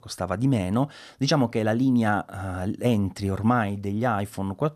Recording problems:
none

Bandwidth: 14 kHz